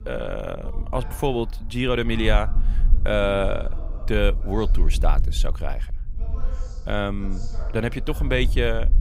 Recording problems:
voice in the background; noticeable; throughout; 20 dB below the speech
low rumble; faint; throughout; 25 dB below the speech

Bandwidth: 15.5 kHz